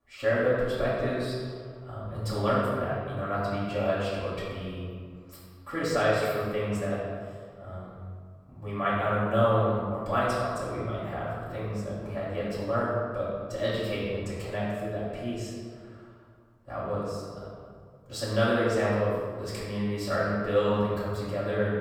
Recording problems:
room echo; strong; dies away in 1.6 s
off-mic speech; far

